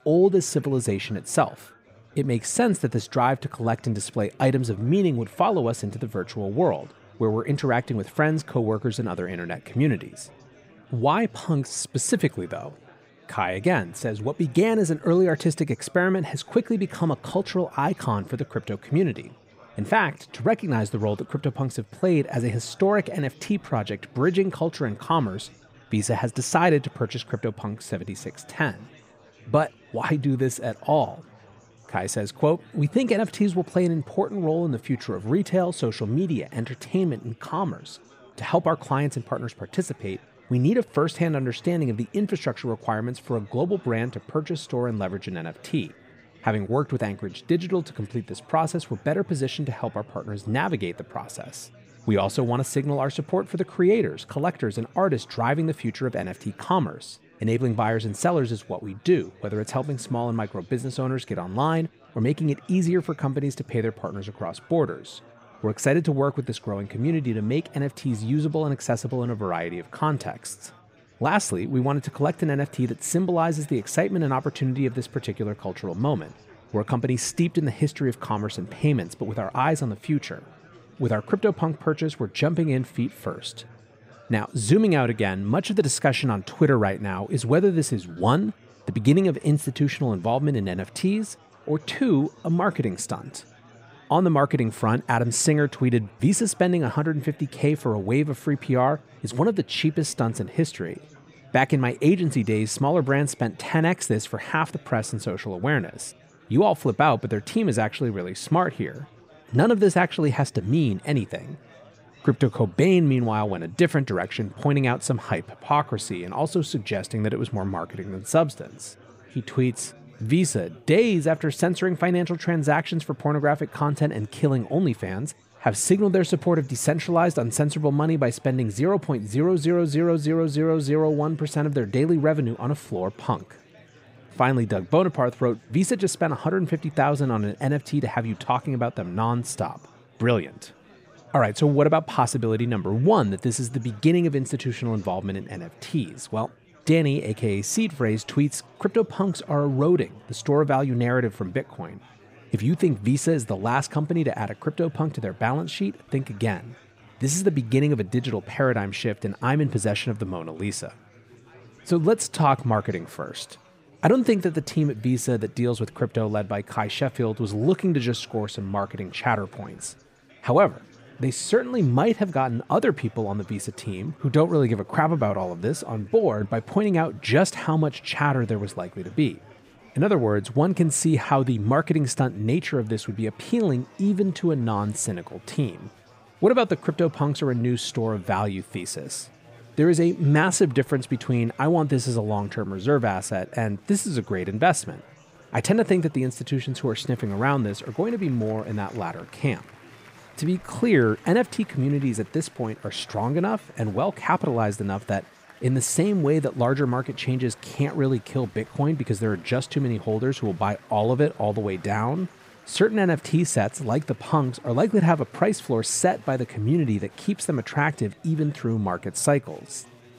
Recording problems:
murmuring crowd; faint; throughout; 25 dB below the speech

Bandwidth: 15.5 kHz